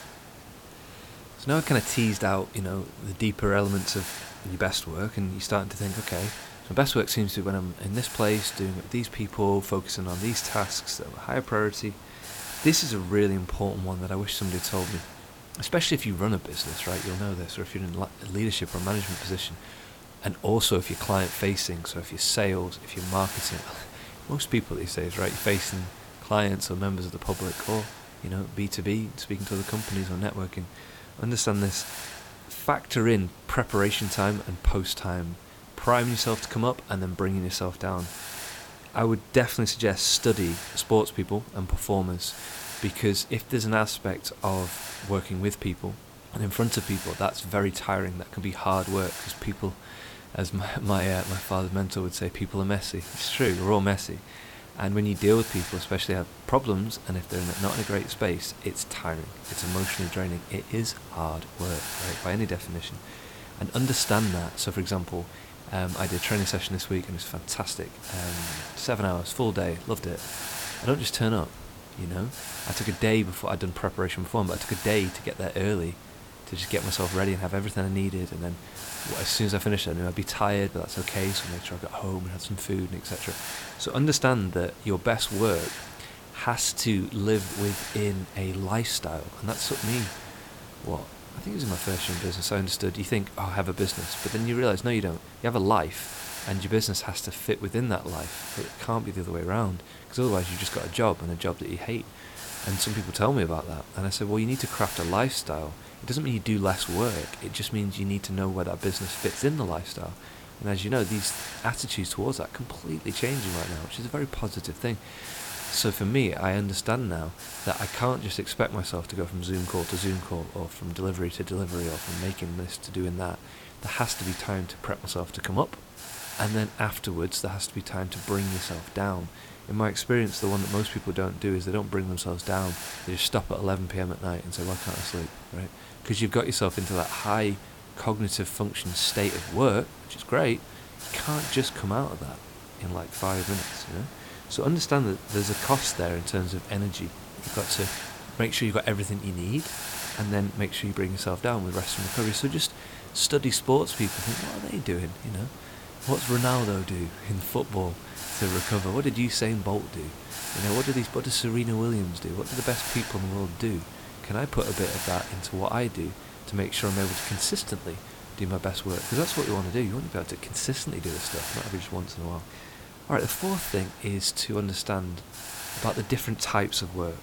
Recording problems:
hiss; loud; throughout; 10 dB below the speech

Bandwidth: 18 kHz